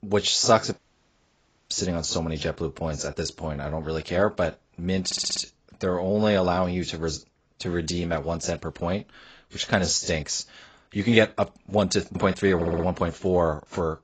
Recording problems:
garbled, watery; badly; nothing above 7.5 kHz
uneven, jittery; strongly; from 0.5 to 10 s
audio cutting out; at 0.5 s for 1 s
audio stuttering; at 5 s and at 13 s

